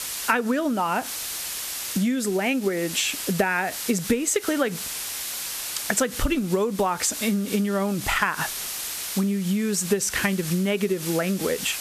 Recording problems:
squashed, flat; heavily
hiss; loud; throughout; 7 dB below the speech

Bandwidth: 14 kHz